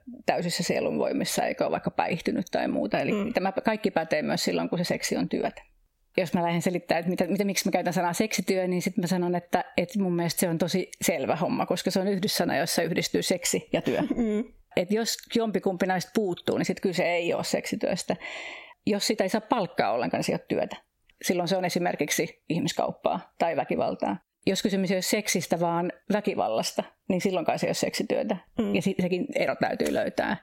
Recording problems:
squashed, flat; somewhat

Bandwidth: 16.5 kHz